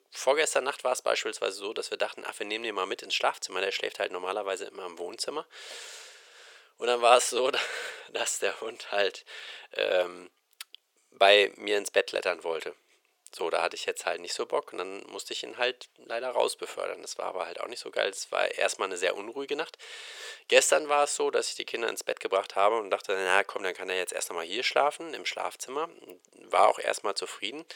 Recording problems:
thin; very; fading below 450 Hz

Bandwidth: 18 kHz